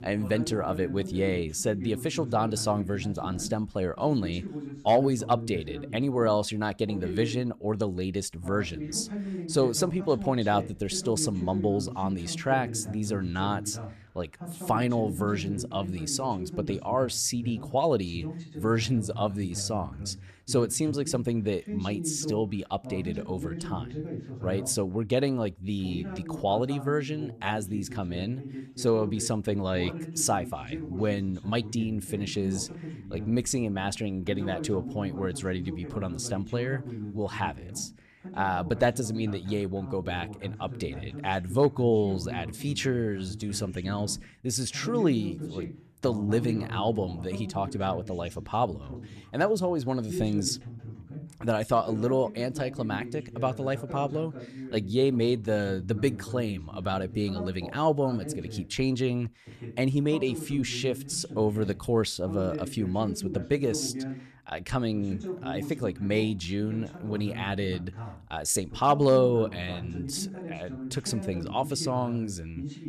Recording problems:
voice in the background; loud; throughout; 10 dB below the speech

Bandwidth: 13.5 kHz